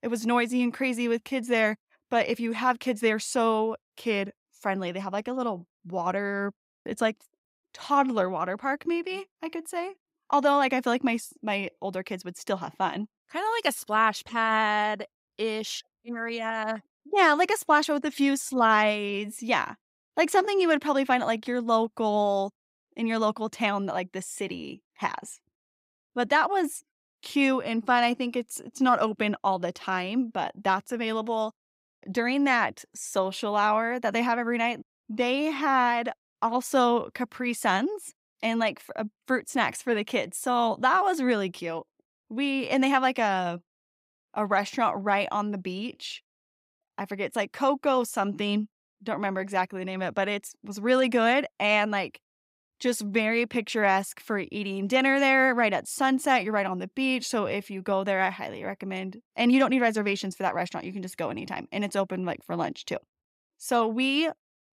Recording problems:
none

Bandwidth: 15.5 kHz